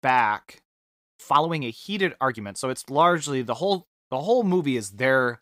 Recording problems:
uneven, jittery; strongly; from 1 to 4.5 s

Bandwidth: 15.5 kHz